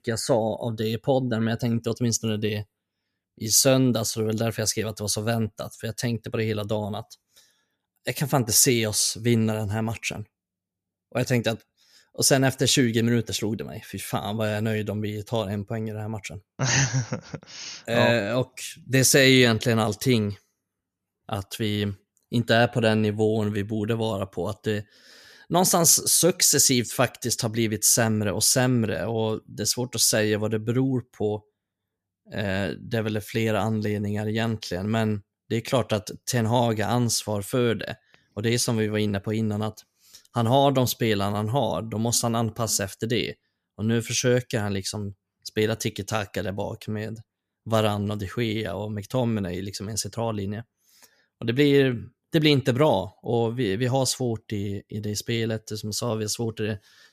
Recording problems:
none

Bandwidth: 14.5 kHz